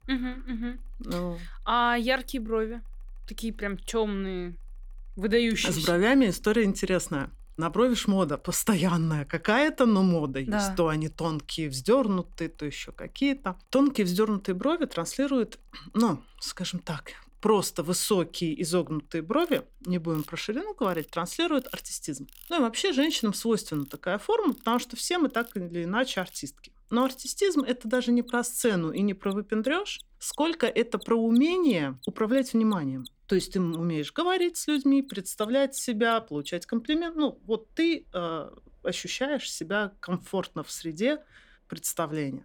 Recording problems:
machinery noise; faint; throughout; 25 dB below the speech

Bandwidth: 18.5 kHz